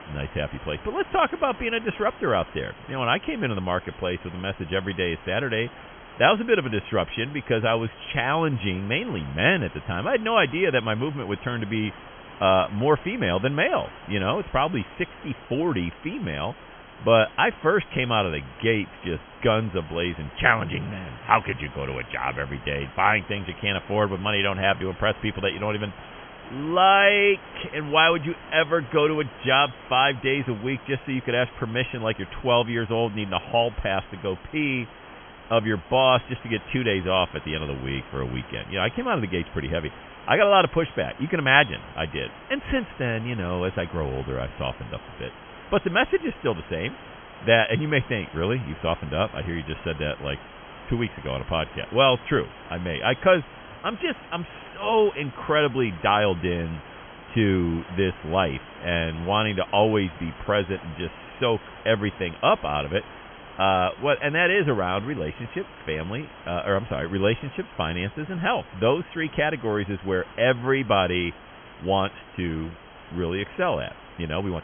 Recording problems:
high frequencies cut off; severe; nothing above 3.5 kHz
hiss; noticeable; throughout; 20 dB below the speech

